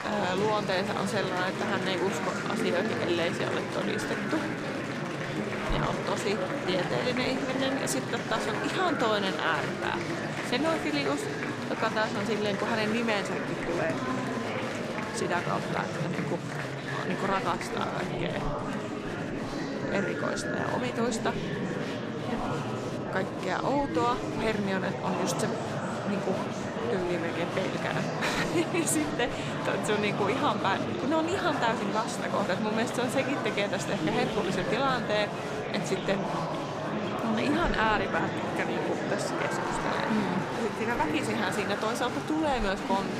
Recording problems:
murmuring crowd; loud; throughout; 1 dB below the speech

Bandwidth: 15 kHz